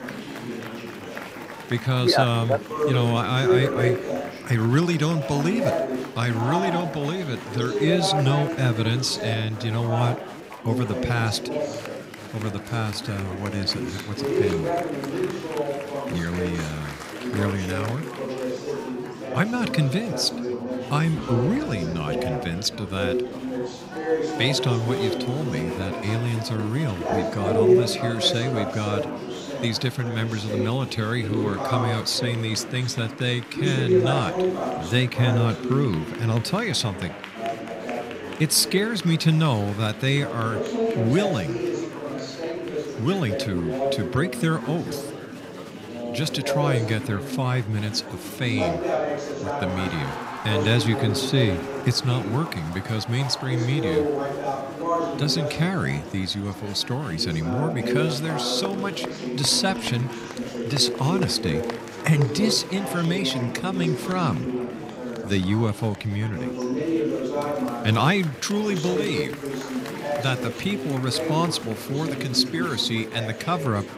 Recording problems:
chatter from many people; loud; throughout; 4 dB below the speech

